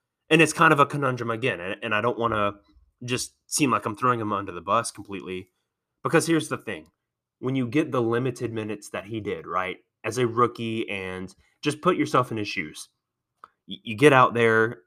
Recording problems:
none

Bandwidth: 14.5 kHz